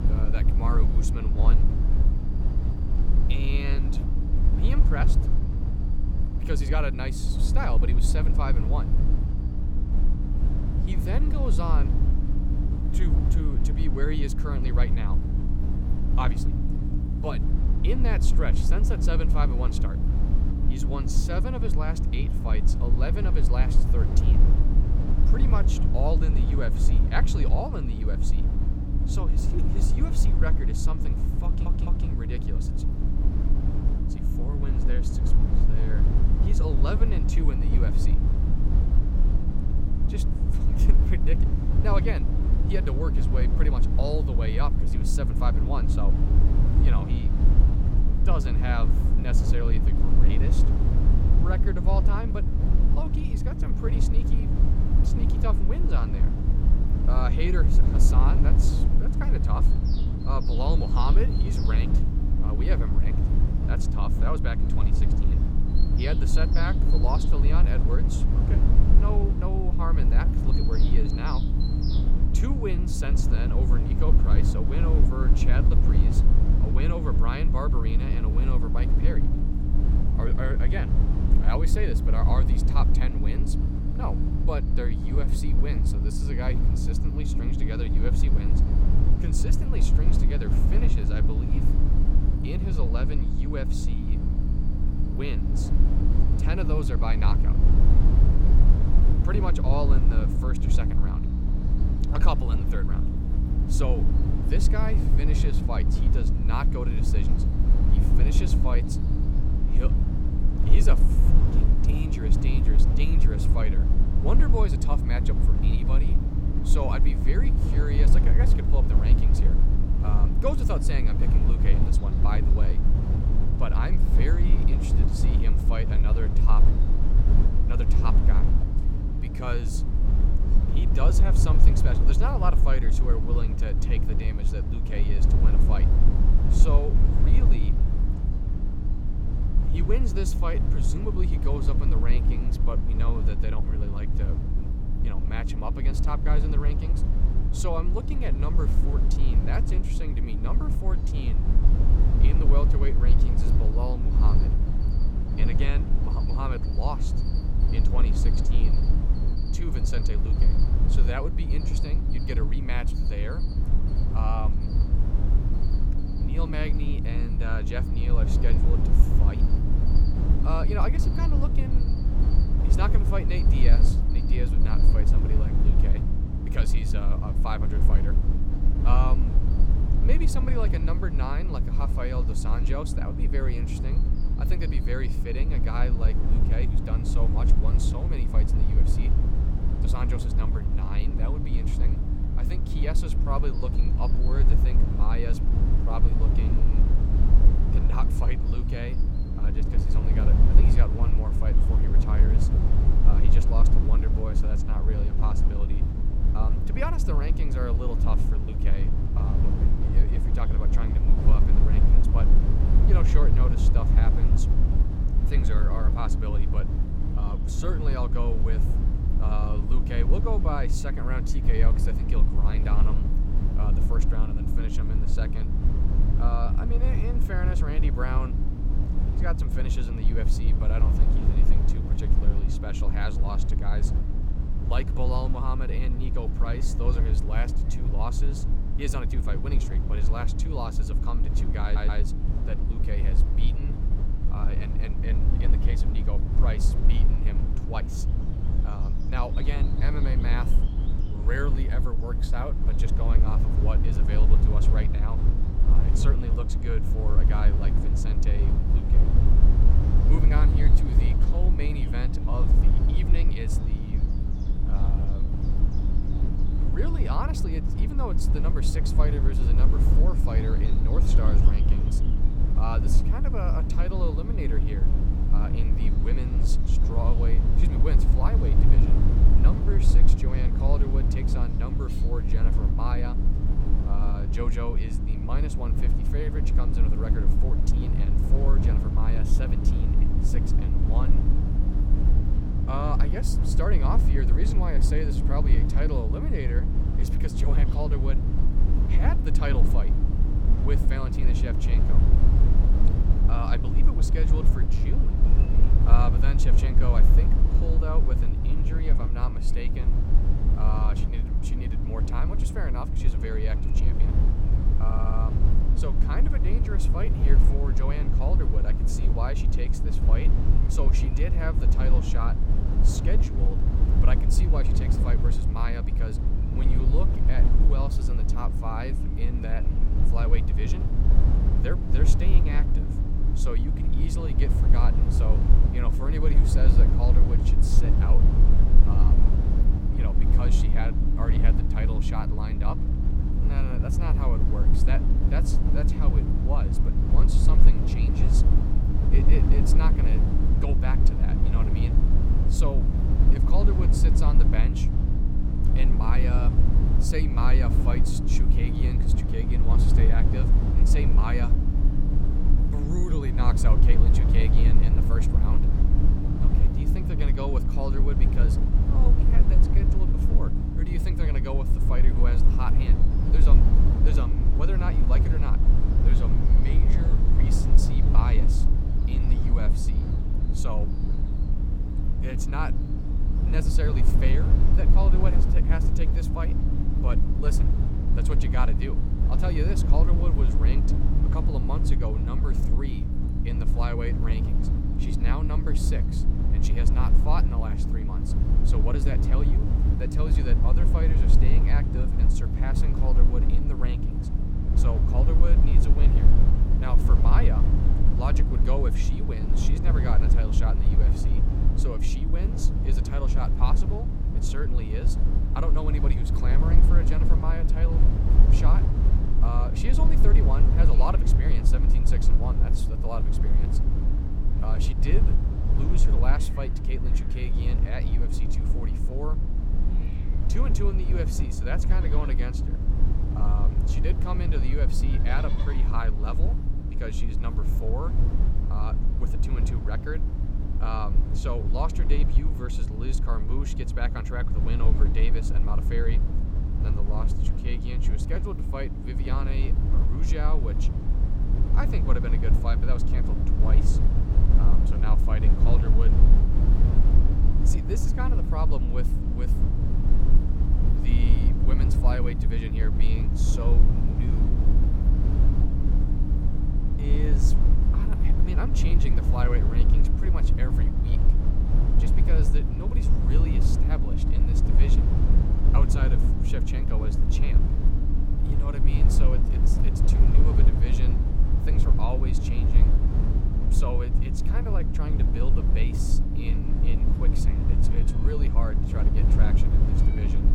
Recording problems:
electrical hum; loud; throughout; 60 Hz, 7 dB below the speech
low rumble; loud; throughout; 4 dB below the speech
animal sounds; noticeable; throughout; 20 dB below the speech
audio stuttering; at 31 s, at 4:02 and at 5:15

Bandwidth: 17 kHz